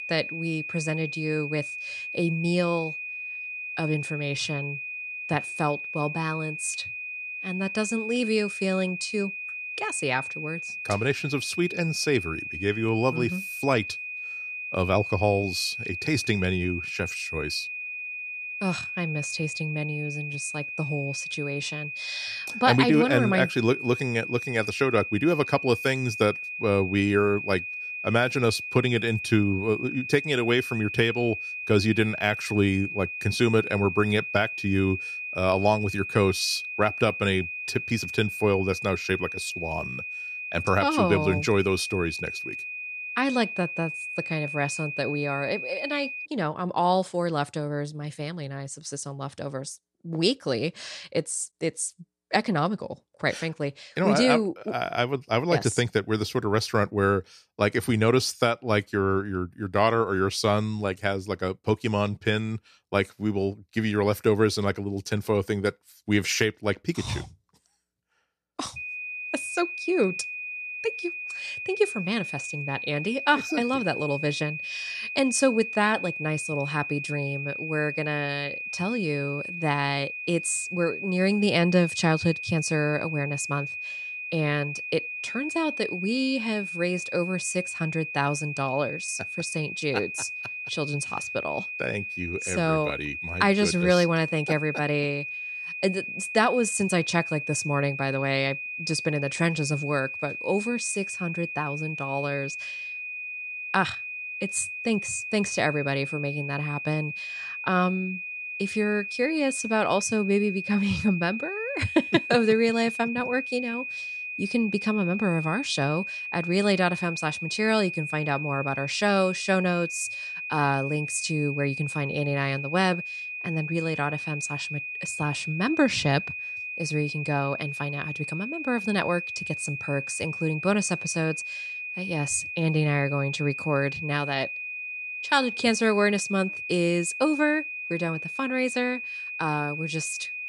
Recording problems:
high-pitched whine; loud; until 46 s and from 1:09 on; 2.5 kHz, 6 dB below the speech

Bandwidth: 14.5 kHz